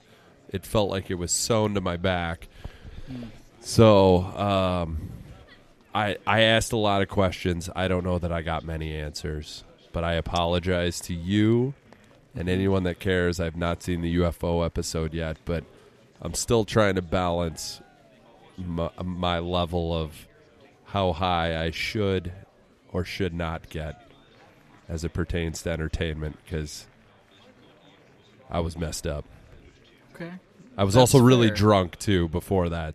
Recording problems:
chatter from many people; faint; throughout; 30 dB below the speech

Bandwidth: 14.5 kHz